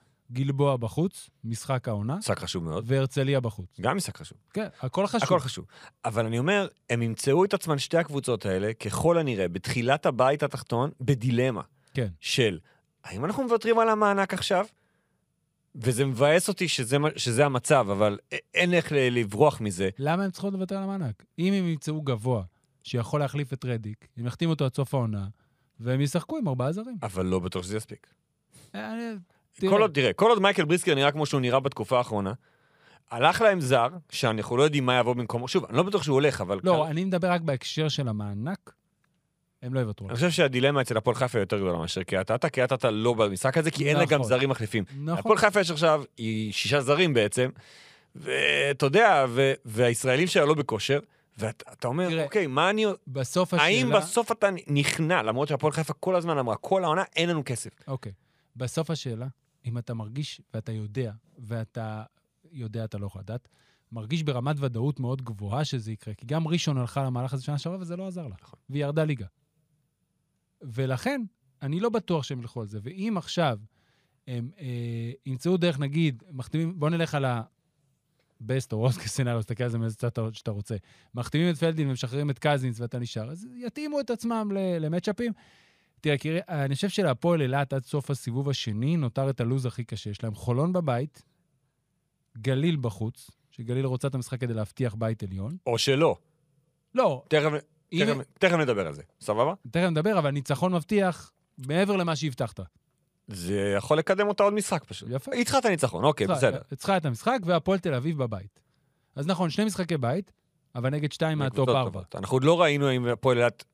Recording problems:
none

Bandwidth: 15 kHz